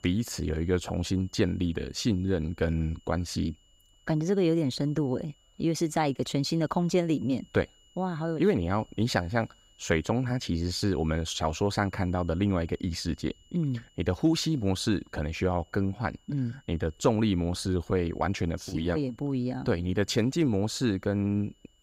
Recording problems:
high-pitched whine; faint; throughout; 3 kHz, 35 dB below the speech

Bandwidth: 15.5 kHz